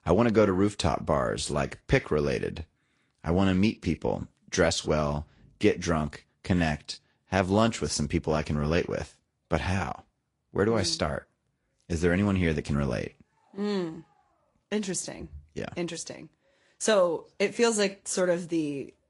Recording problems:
garbled, watery; slightly; nothing above 11 kHz

